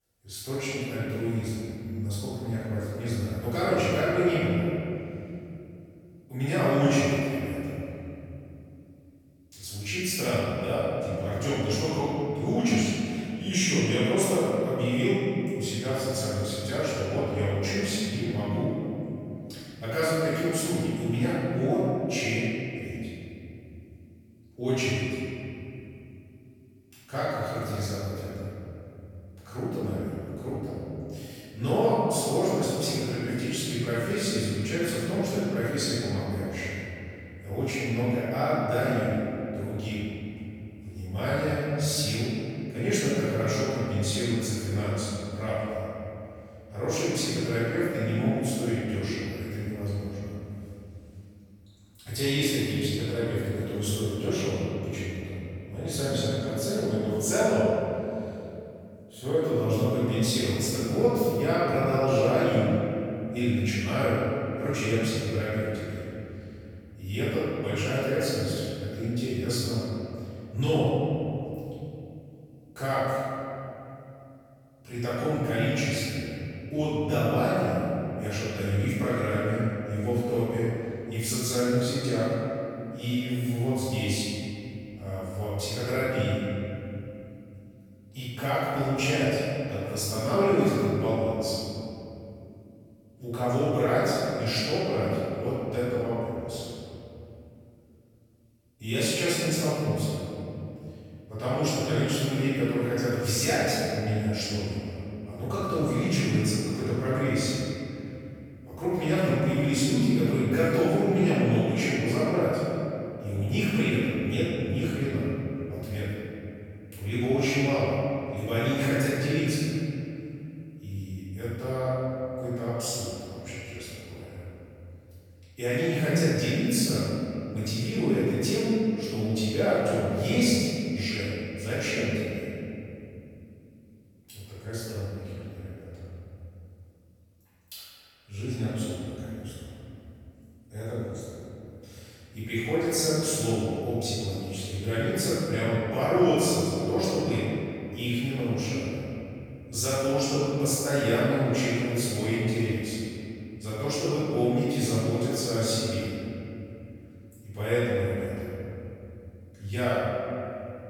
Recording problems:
room echo; strong; dies away in 2.9 s
off-mic speech; far

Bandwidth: 18.5 kHz